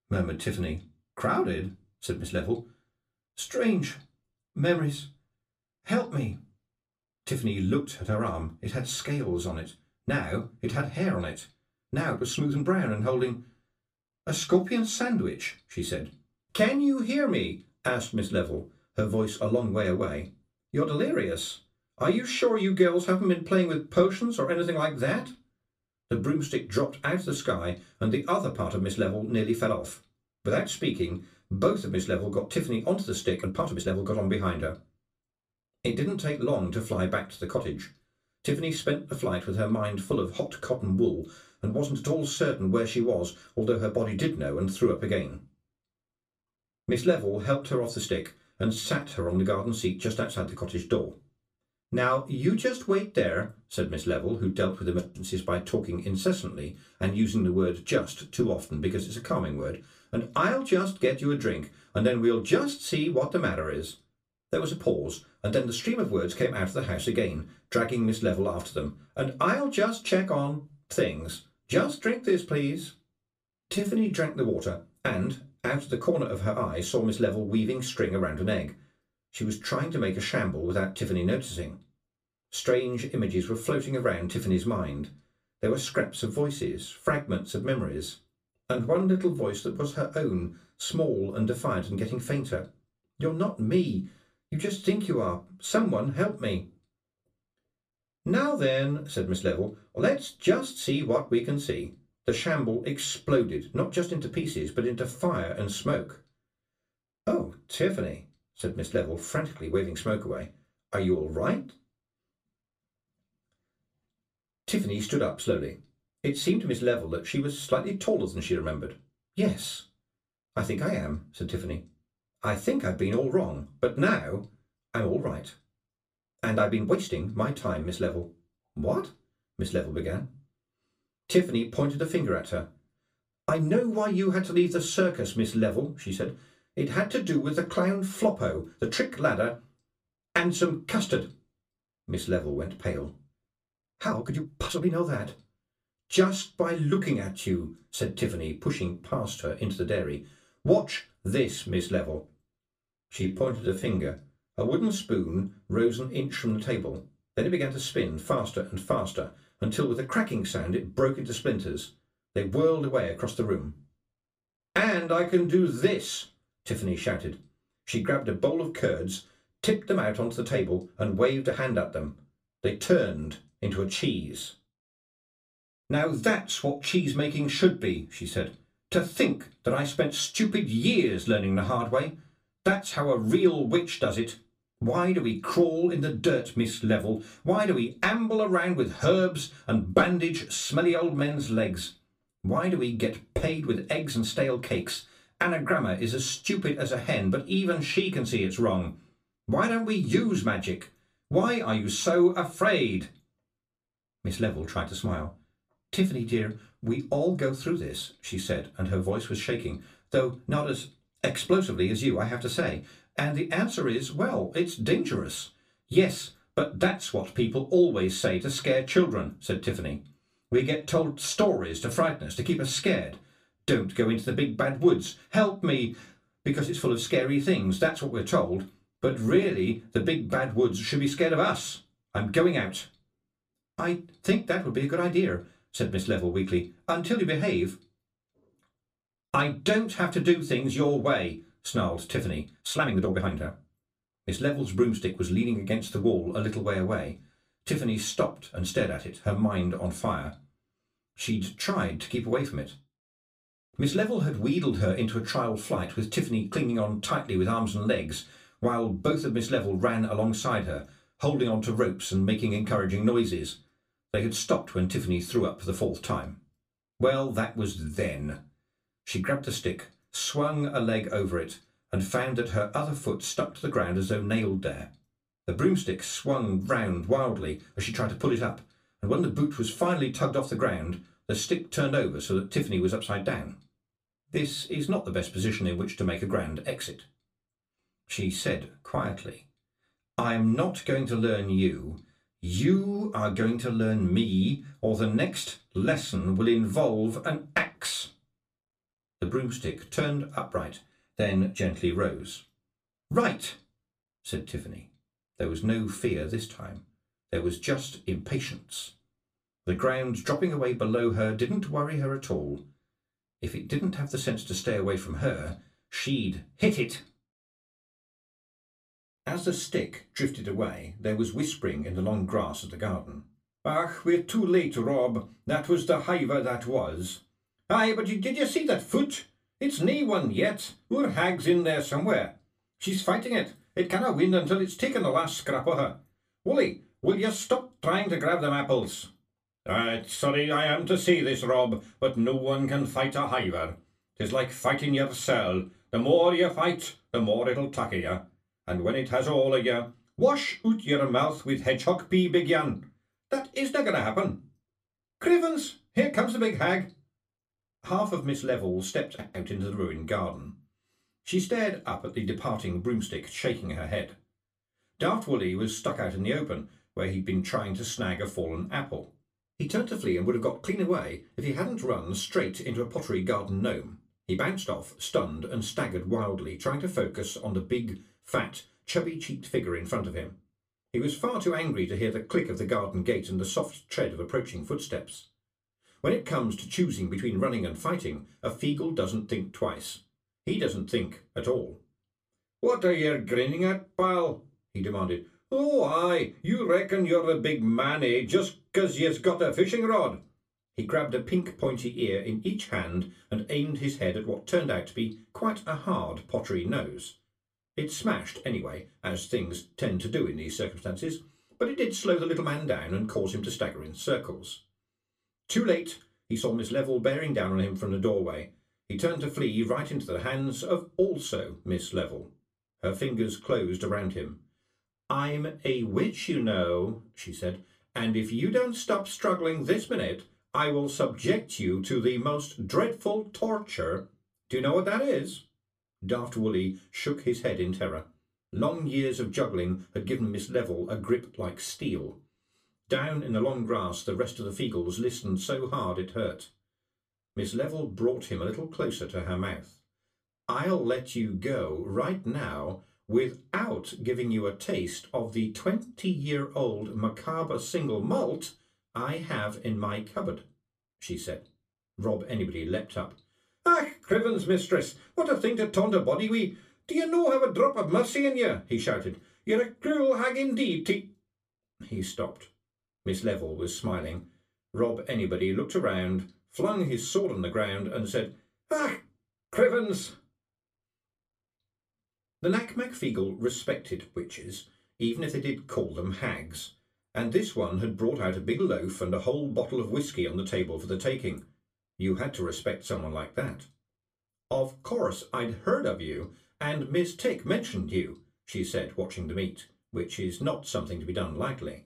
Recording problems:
room echo; very slight; dies away in 0.2 s
off-mic speech; somewhat distant
uneven, jittery; strongly; from 12 s to 7:45

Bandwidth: 15 kHz